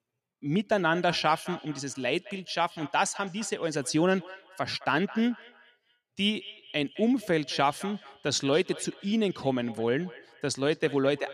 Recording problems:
echo of what is said; noticeable; throughout; 210 ms later, 20 dB below the speech

